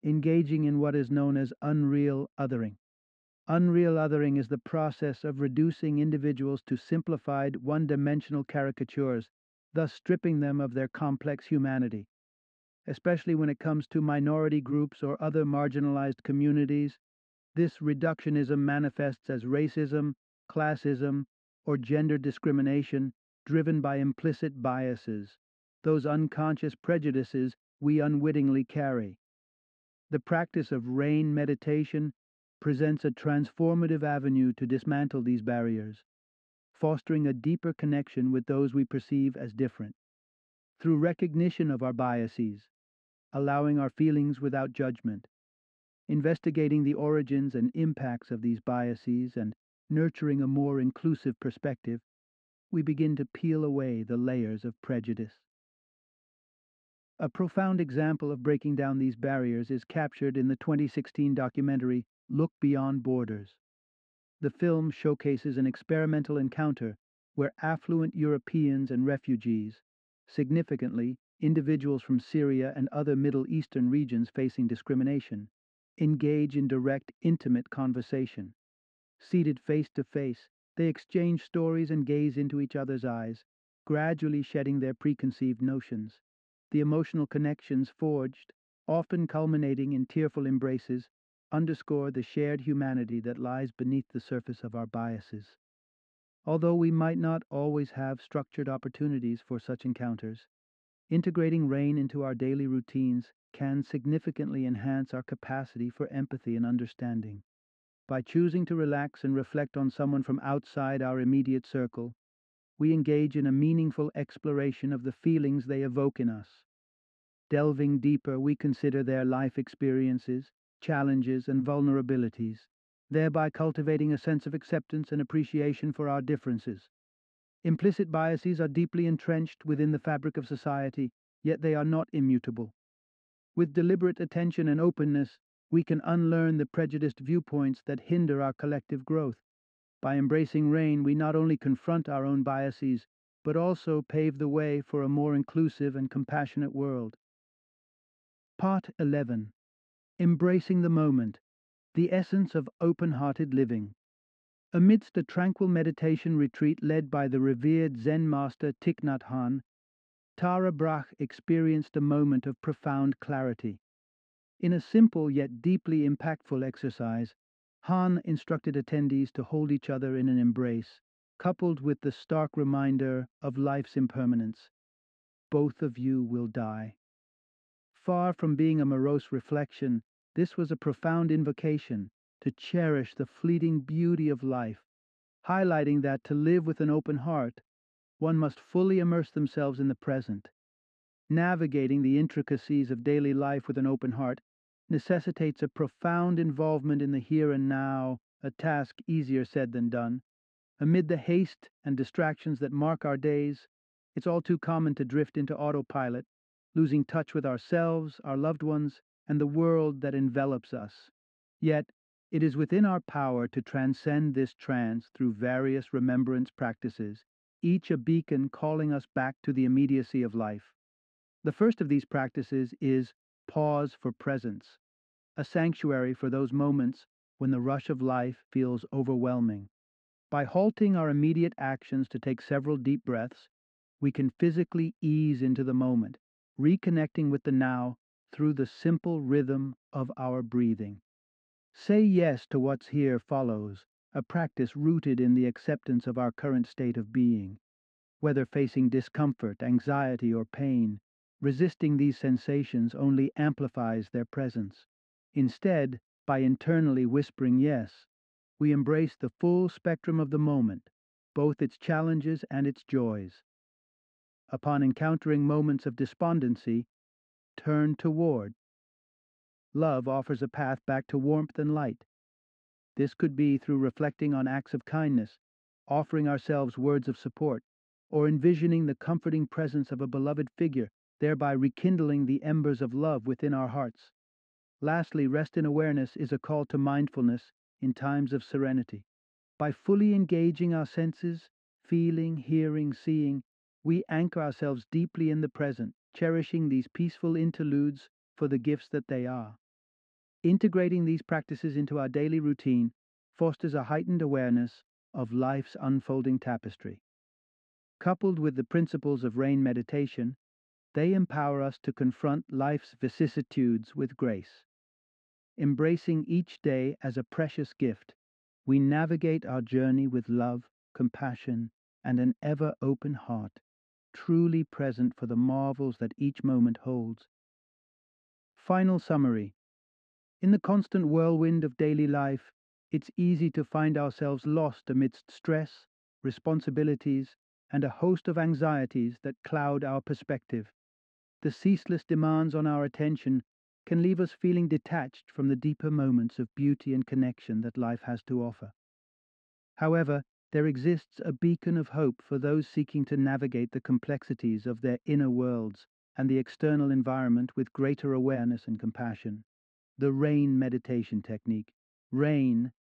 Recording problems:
muffled; slightly; fading above 2.5 kHz

